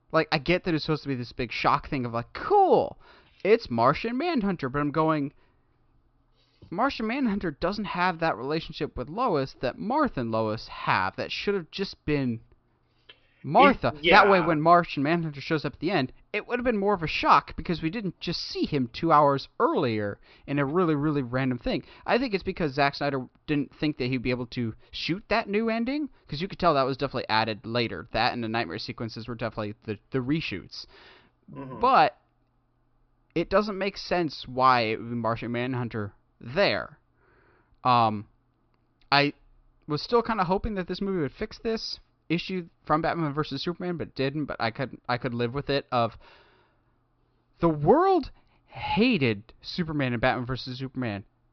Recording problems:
high frequencies cut off; noticeable; nothing above 5.5 kHz

